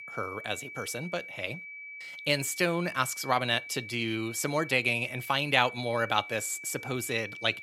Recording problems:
high-pitched whine; noticeable; throughout; 2.5 kHz, 10 dB below the speech

